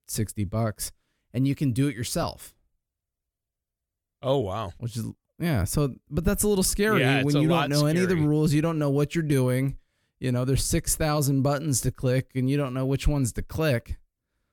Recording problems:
none

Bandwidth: 18 kHz